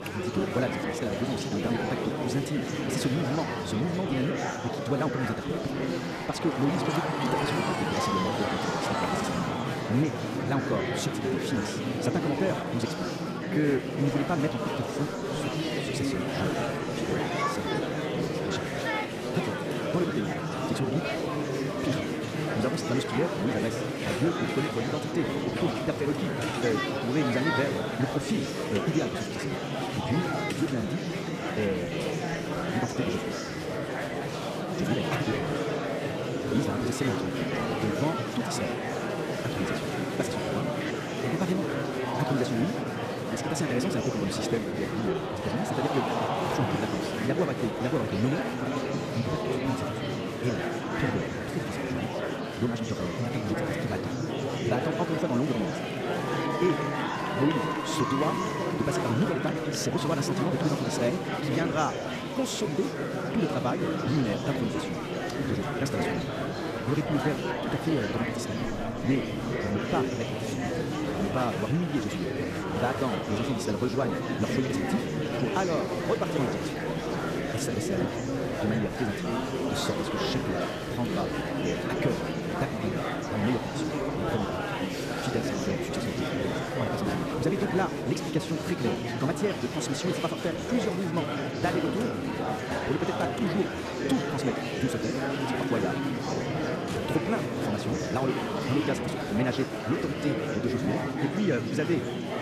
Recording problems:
wrong speed, natural pitch; too fast; 1.8 times normal speed
murmuring crowd; very loud; throughout; 1 dB above the speech

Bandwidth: 14.5 kHz